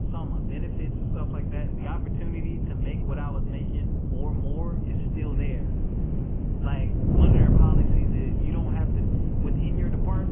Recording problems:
garbled, watery; badly
high frequencies cut off; severe; nothing above 3 kHz
wind noise on the microphone; heavy; 5 dB above the speech
animal sounds; noticeable; throughout; 15 dB below the speech
abrupt cut into speech; at the end

